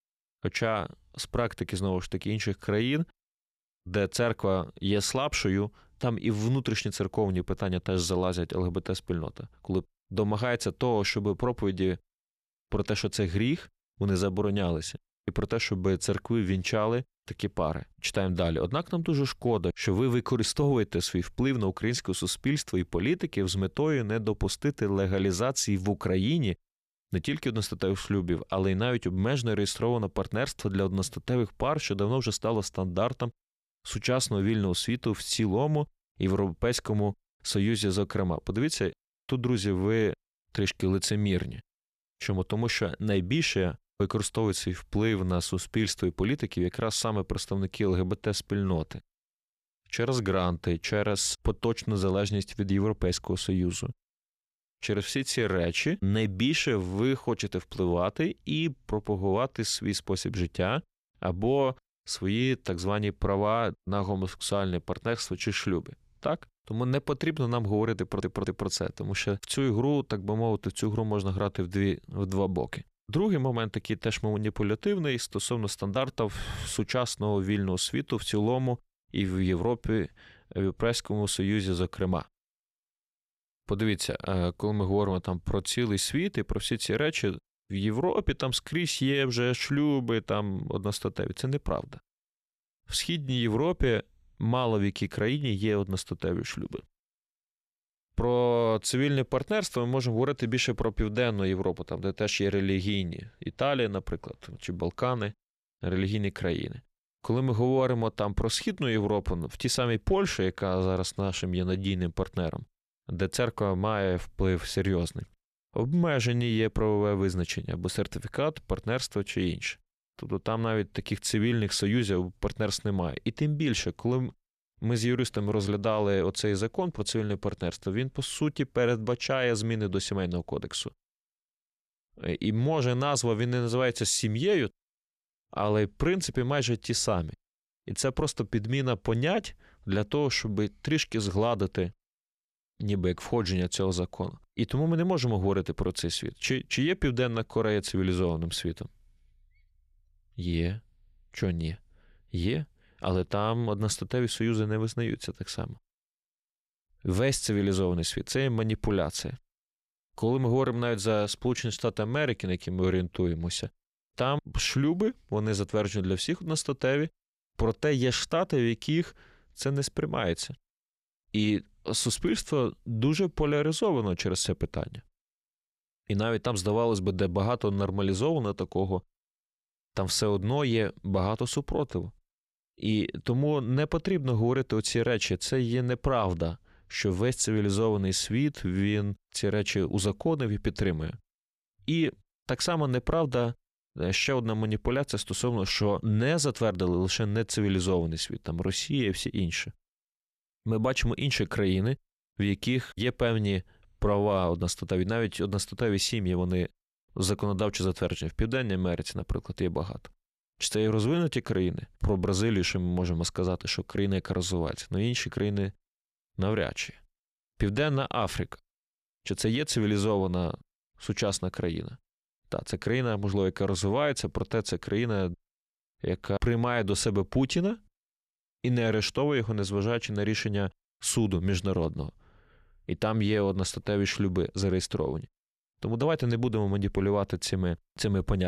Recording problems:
audio stuttering; at 1:08
abrupt cut into speech; at the end

